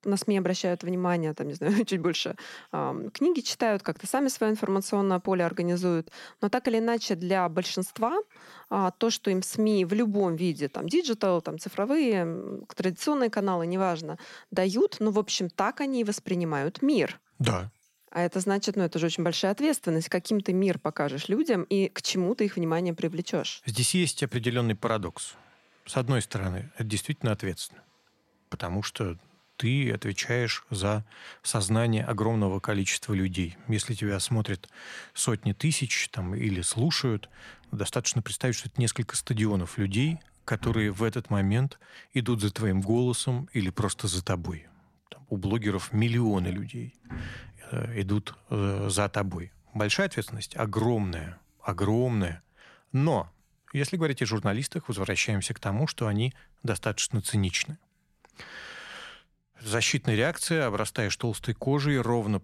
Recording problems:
household noises; faint; throughout; 30 dB below the speech

